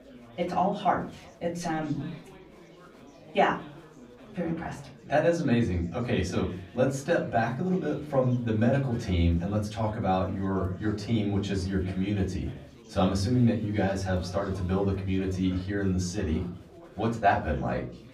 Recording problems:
off-mic speech; far
room echo; very slight; dies away in 0.4 s
chatter from many people; faint; throughout; 20 dB below the speech

